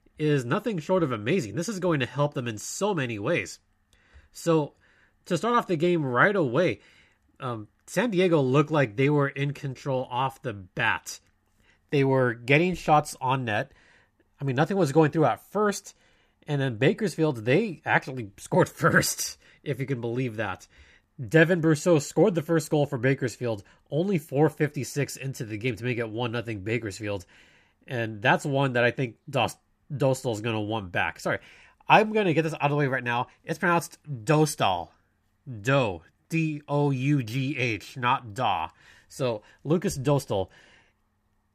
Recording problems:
none

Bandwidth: 14.5 kHz